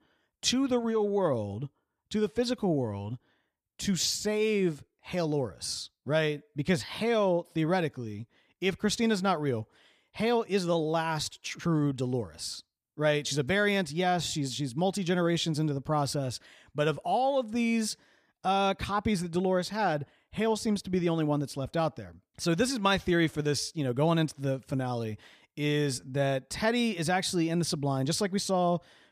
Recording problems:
none

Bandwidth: 14.5 kHz